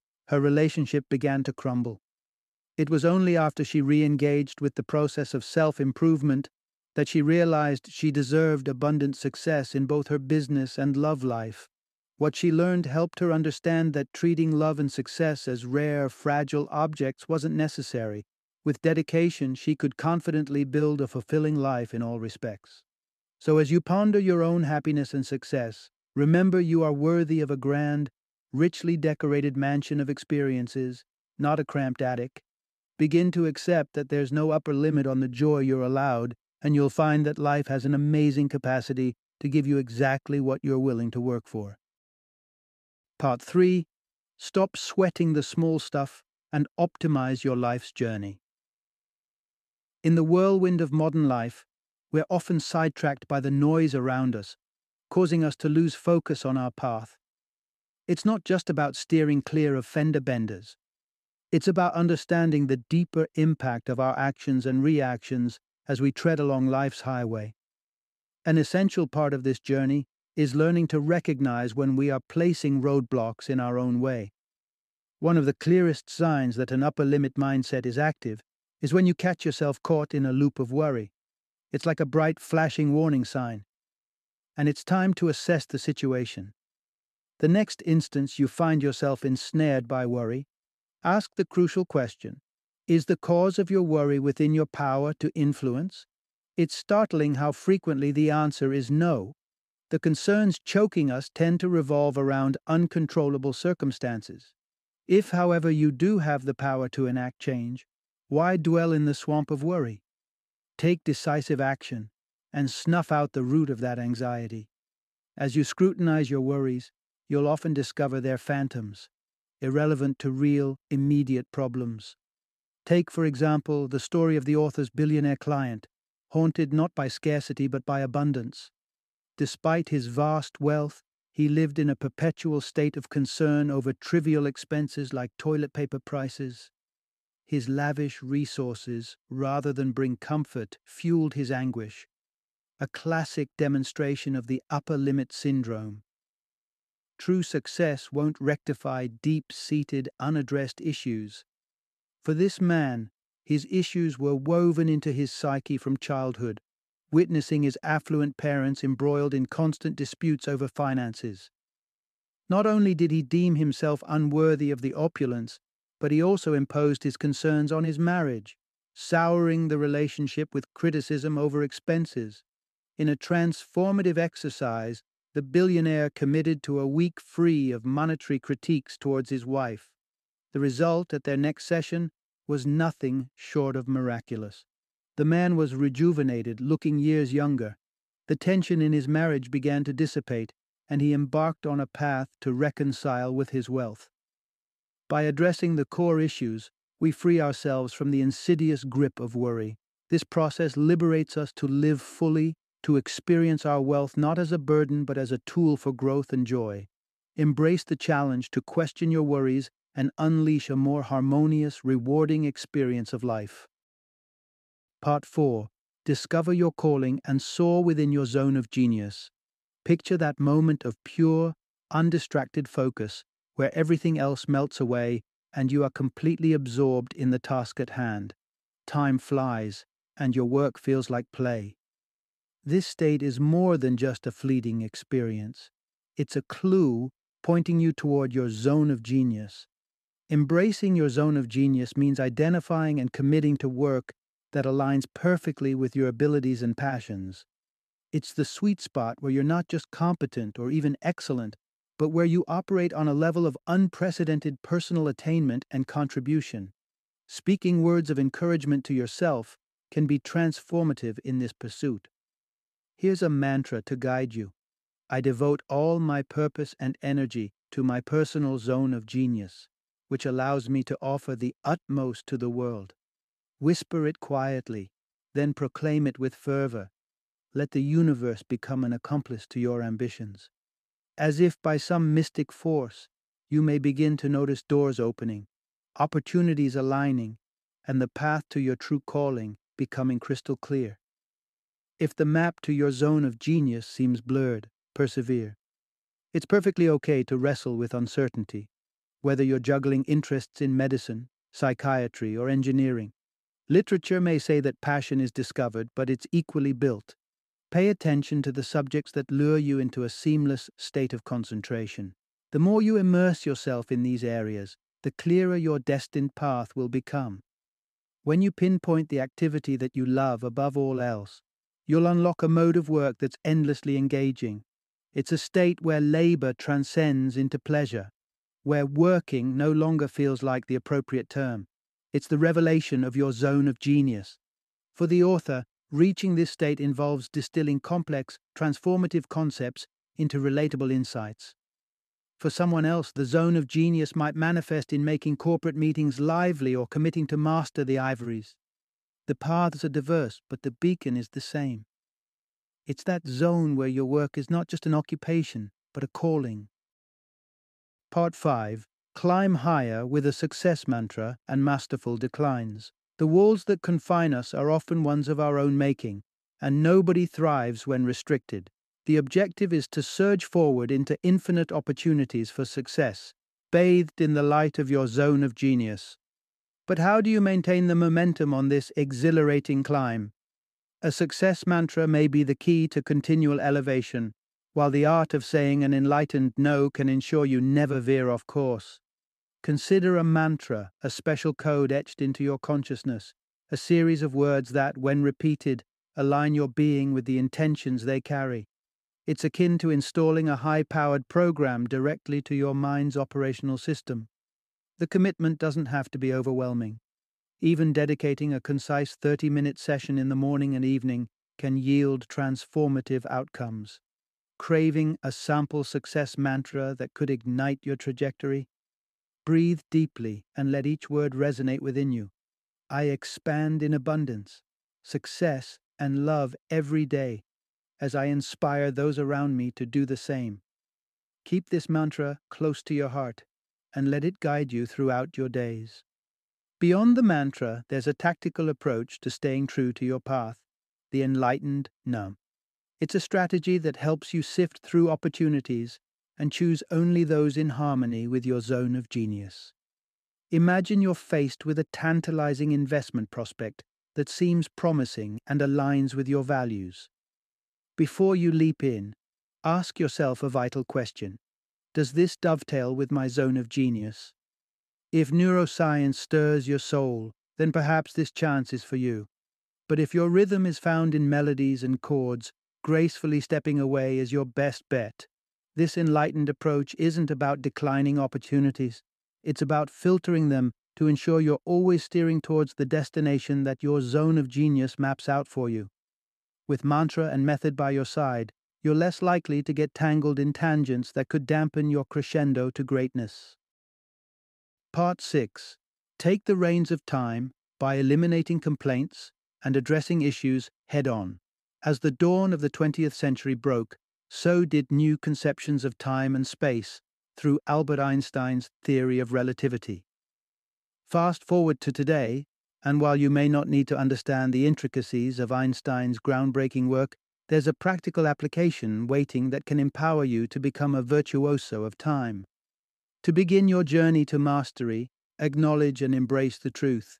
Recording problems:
none

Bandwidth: 14 kHz